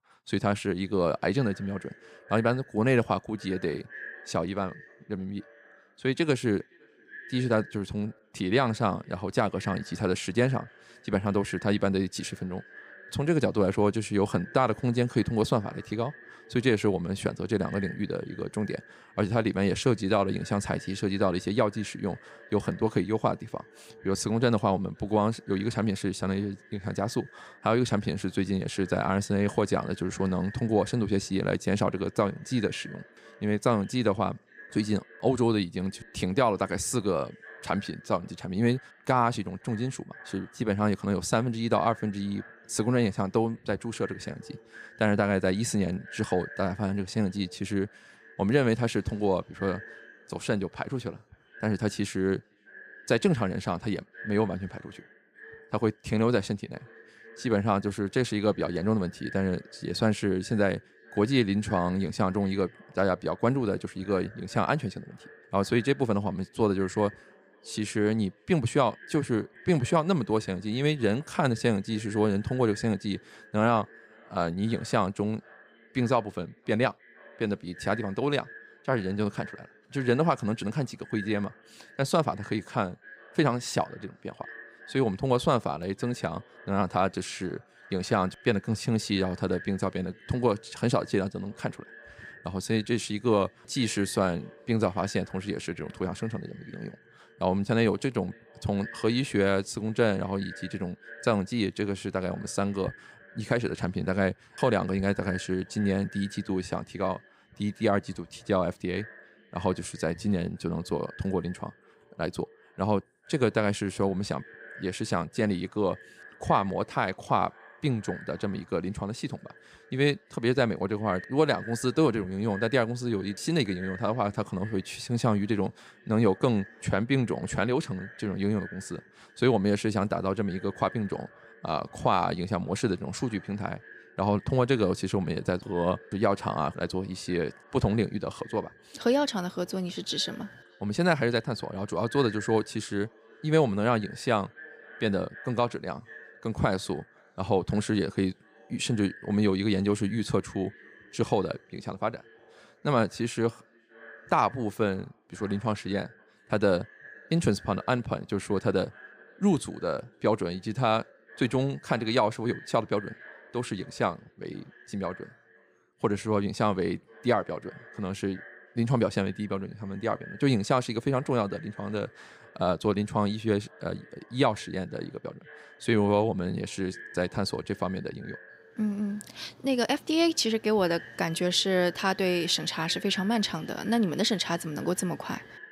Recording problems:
echo of what is said; faint; throughout; 510 ms later, 20 dB below the speech

